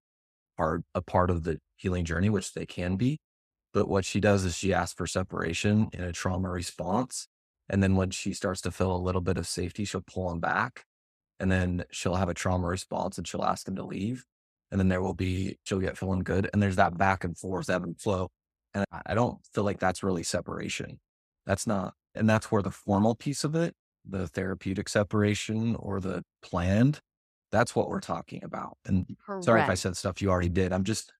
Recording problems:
none

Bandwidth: 14.5 kHz